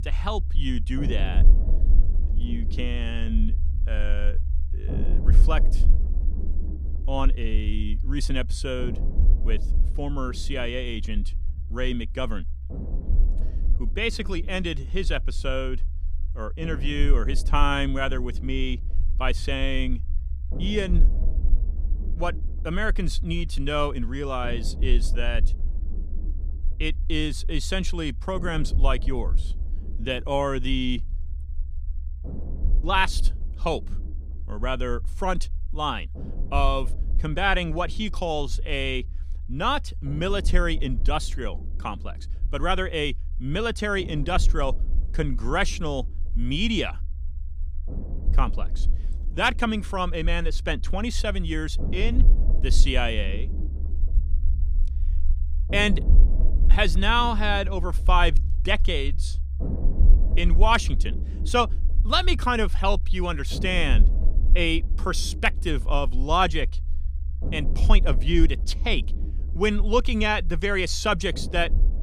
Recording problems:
low rumble; noticeable; throughout; 20 dB below the speech

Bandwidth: 14.5 kHz